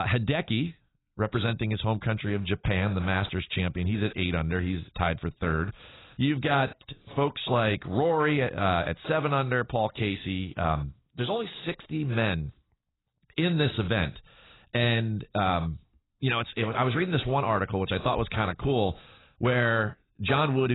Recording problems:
garbled, watery; badly; nothing above 4 kHz
abrupt cut into speech; at the start and the end

